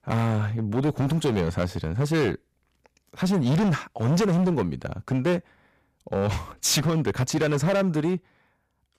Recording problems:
distortion; heavy; 15% of the sound clipped

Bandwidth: 14.5 kHz